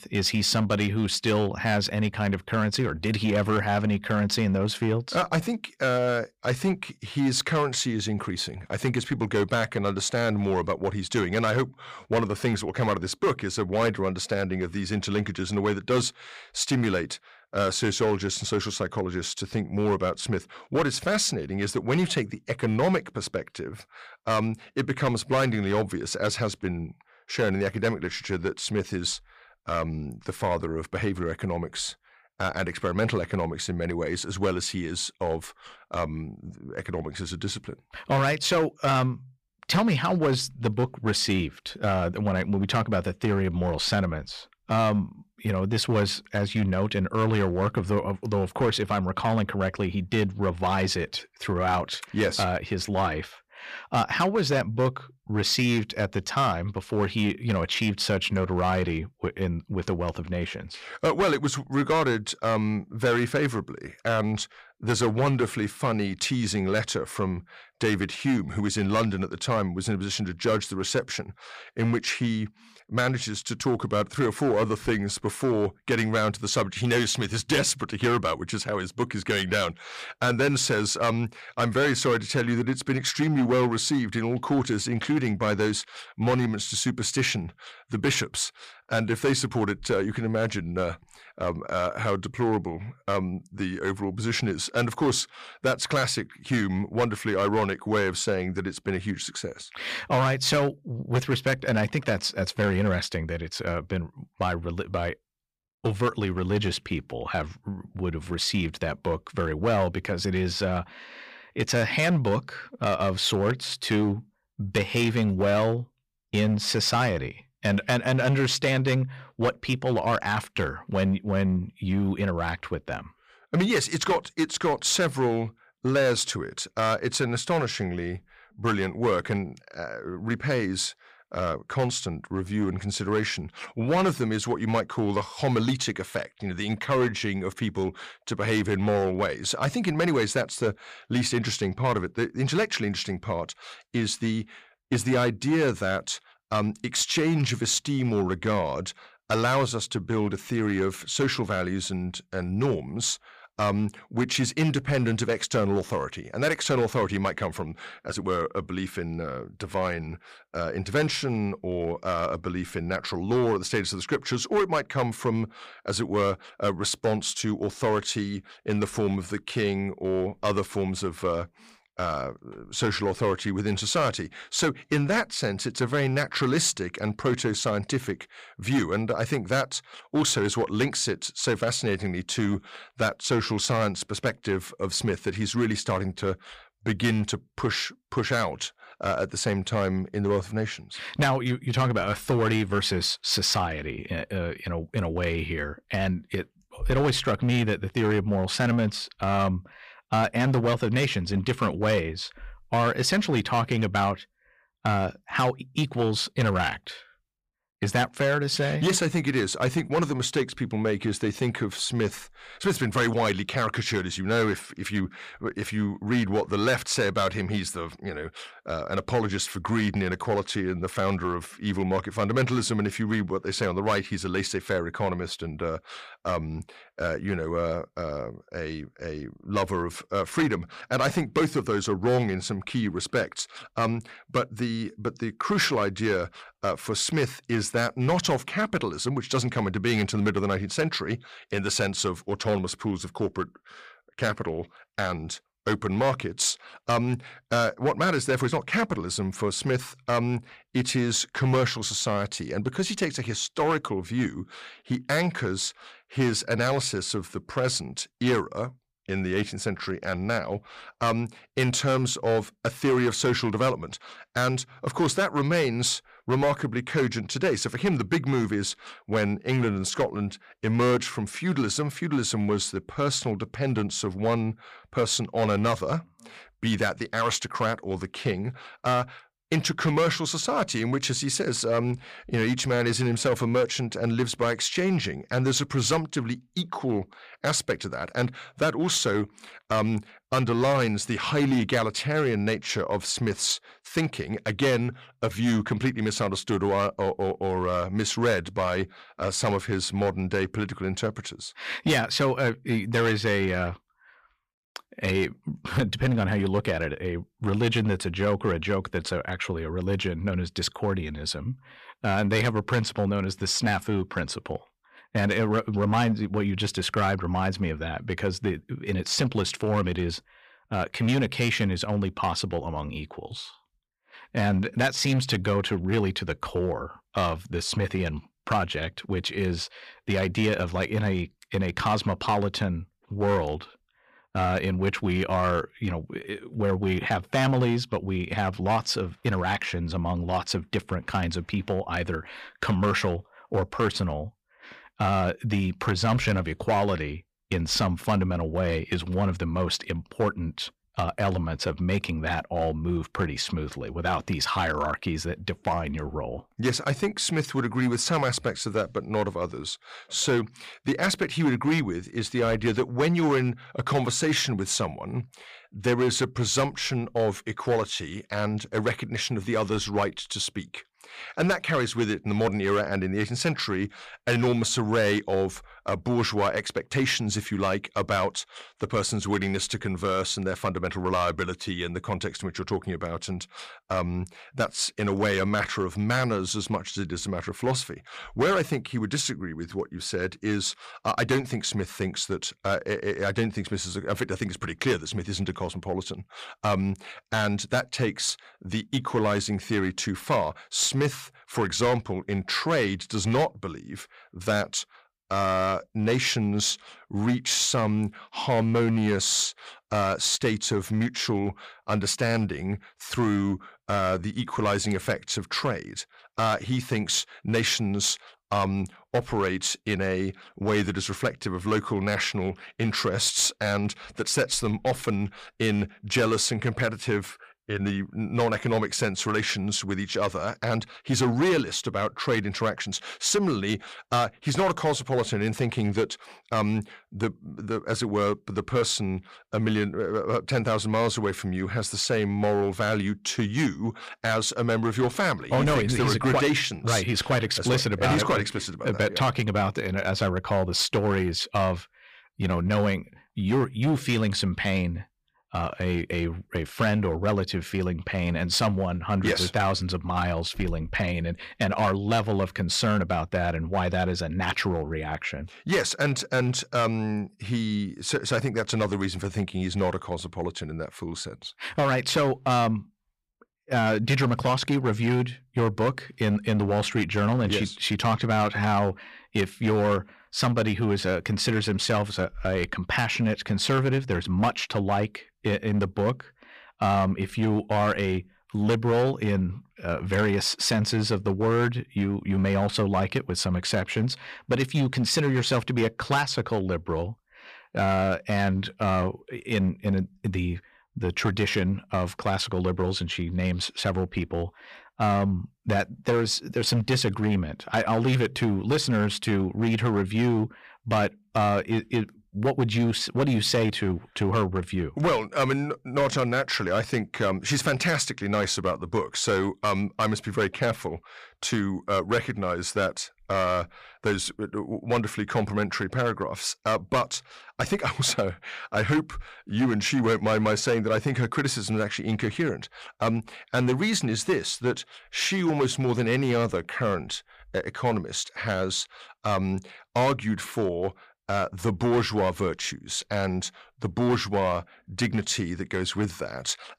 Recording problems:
distortion; slight; 5% of the sound clipped

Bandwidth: 15 kHz